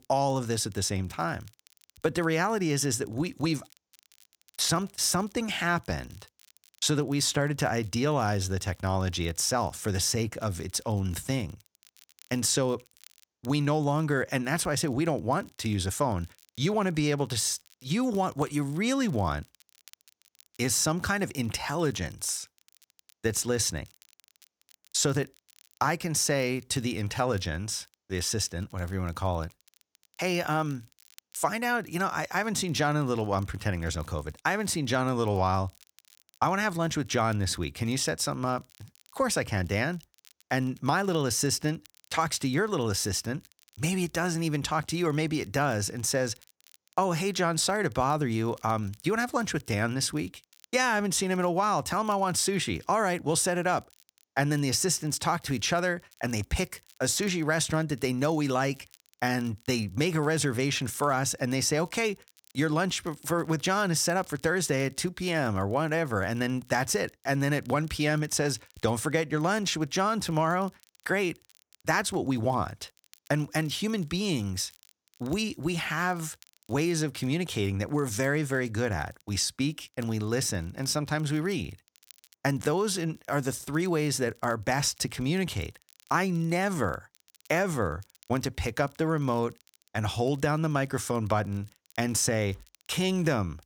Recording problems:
crackle, like an old record; faint; 30 dB below the speech

